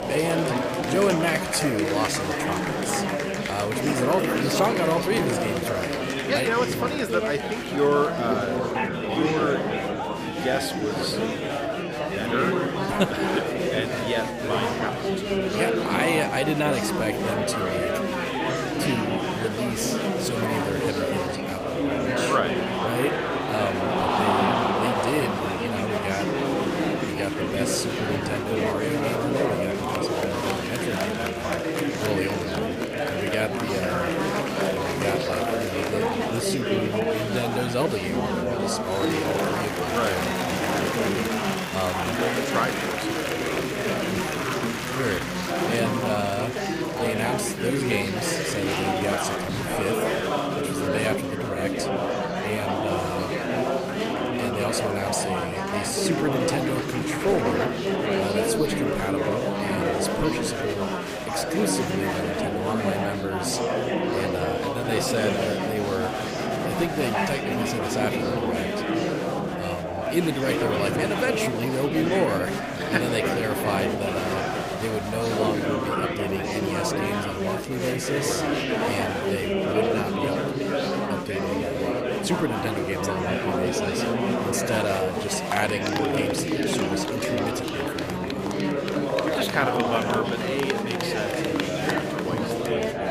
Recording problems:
murmuring crowd; very loud; throughout; 3 dB above the speech

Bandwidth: 15 kHz